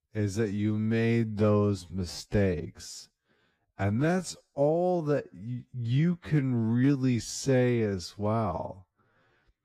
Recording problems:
wrong speed, natural pitch; too slow; 0.6 times normal speed

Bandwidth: 14.5 kHz